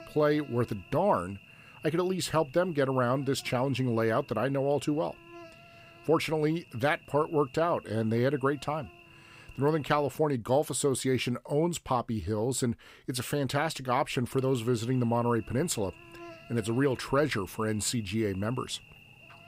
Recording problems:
electrical hum; faint; until 10 s and from 14 s on; 60 Hz, 20 dB below the speech

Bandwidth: 15.5 kHz